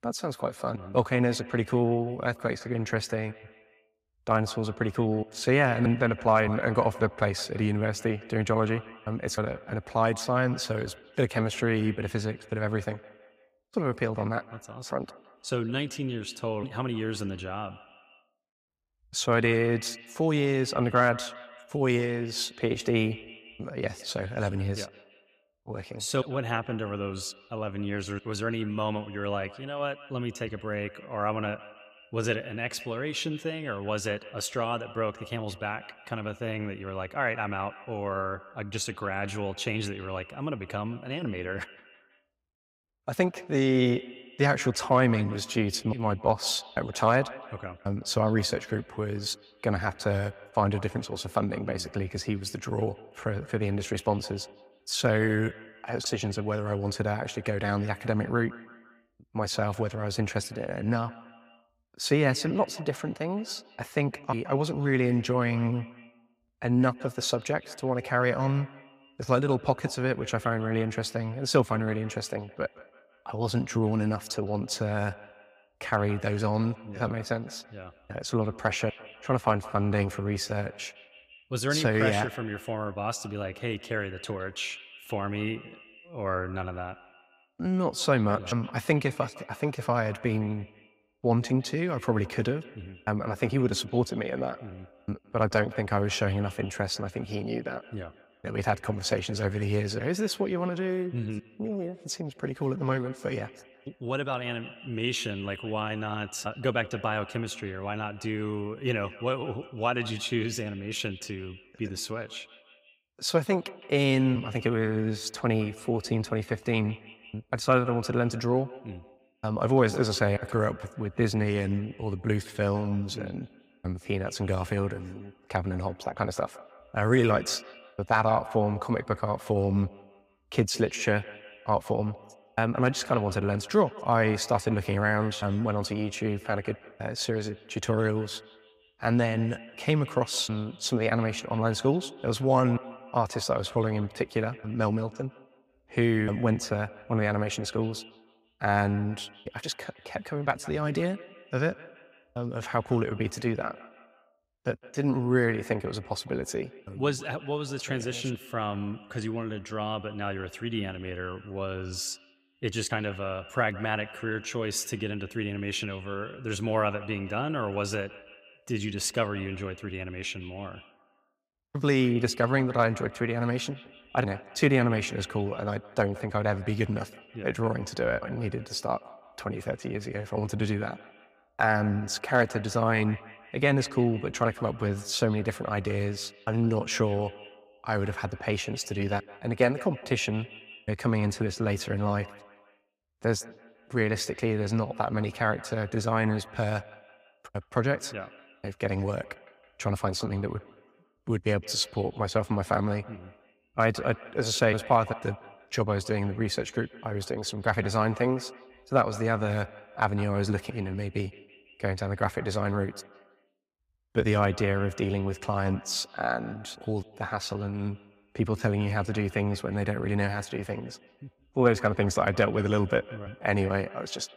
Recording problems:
echo of what is said; faint; throughout; 160 ms later, 20 dB below the speech

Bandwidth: 15.5 kHz